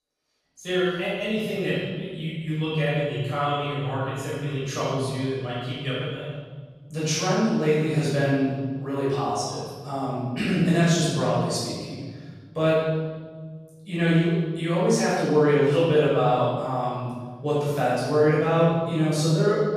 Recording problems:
room echo; strong; dies away in 1.7 s
off-mic speech; far

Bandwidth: 14.5 kHz